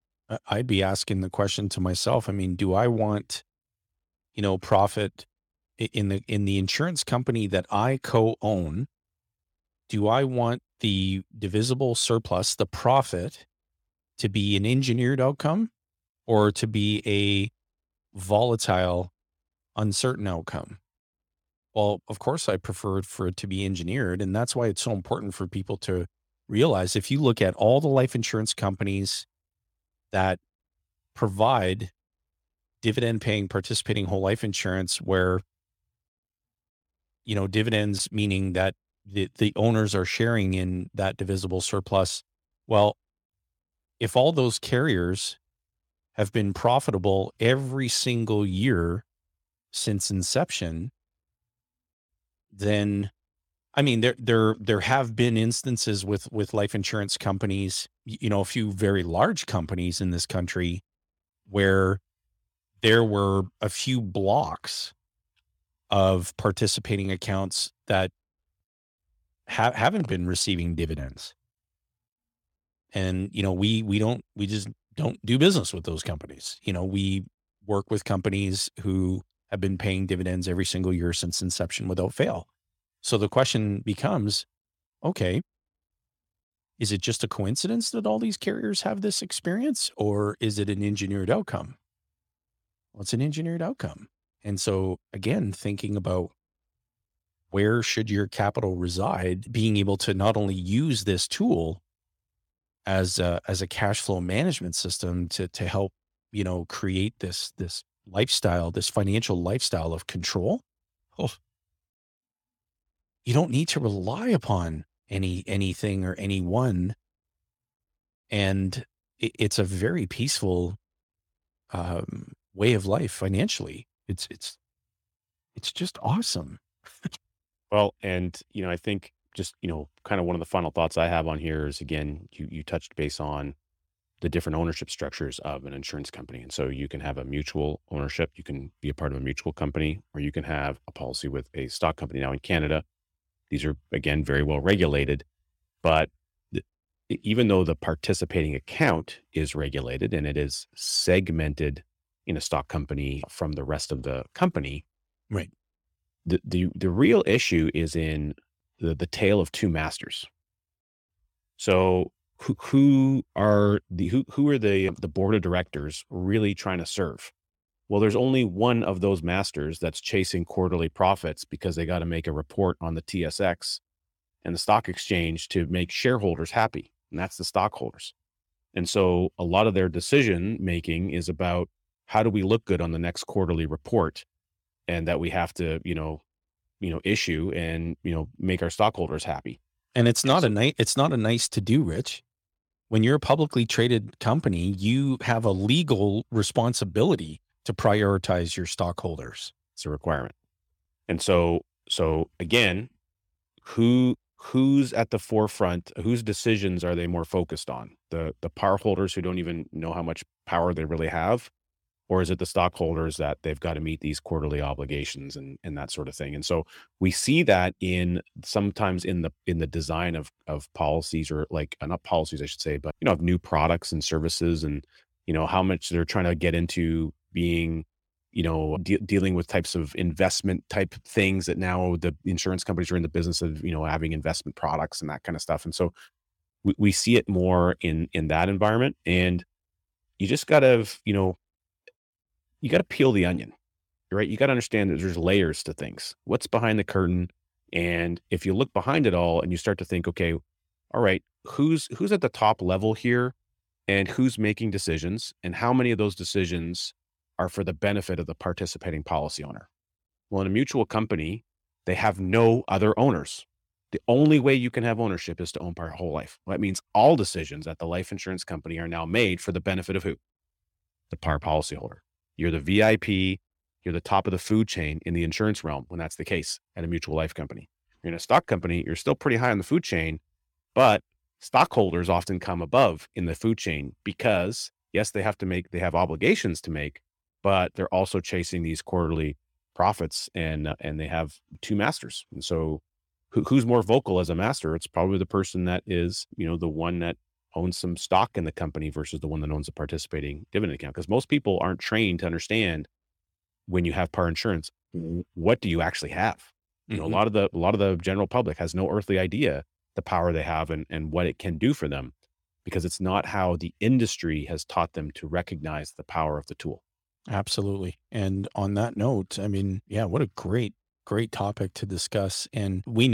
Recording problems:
abrupt cut into speech; at the end

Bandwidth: 17 kHz